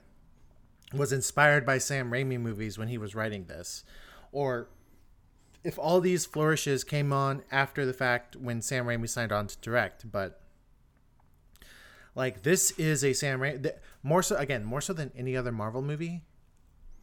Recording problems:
none

